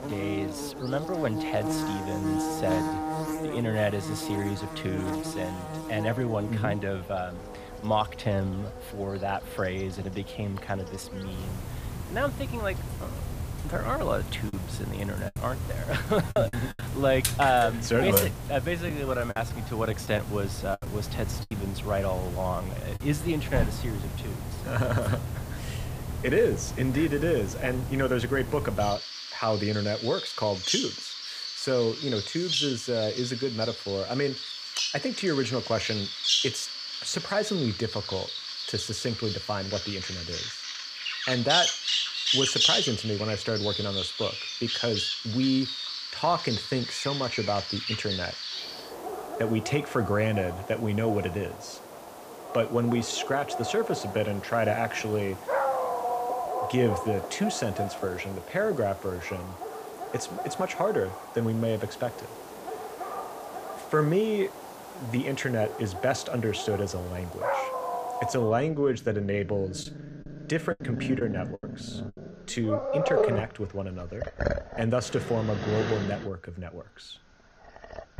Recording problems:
animal sounds; loud; throughout; 3 dB below the speech
choppy; very; from 14 to 17 s, from 19 to 22 s and from 1:10 to 1:12; 8% of the speech affected

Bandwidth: 15 kHz